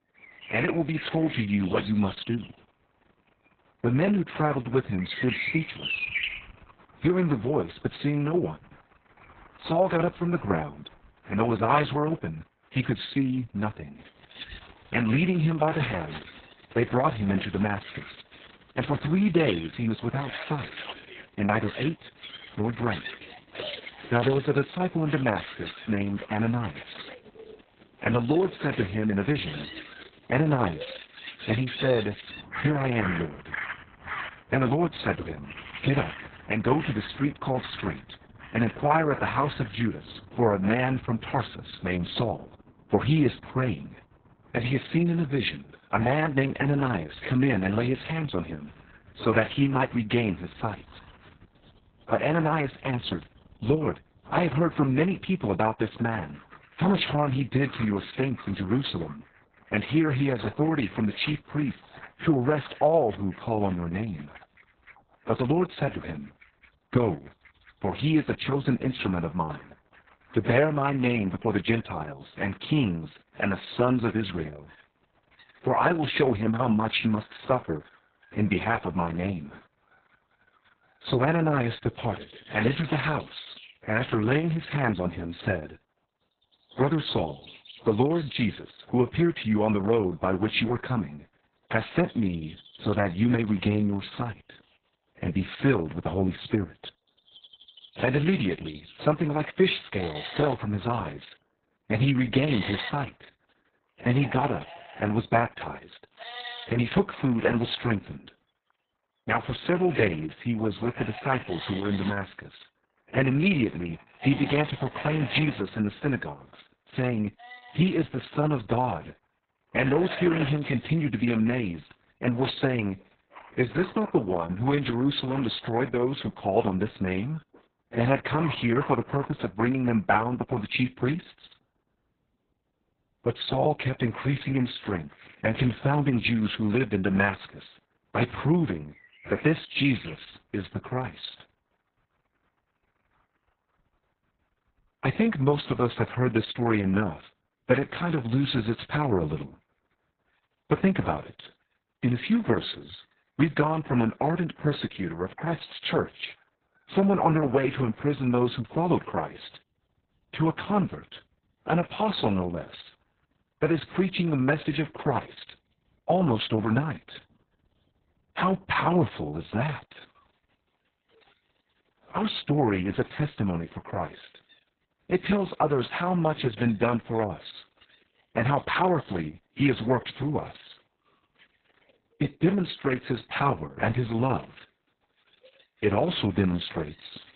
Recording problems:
garbled, watery; badly; nothing above 4 kHz
animal sounds; noticeable; throughout; 15 dB below the speech

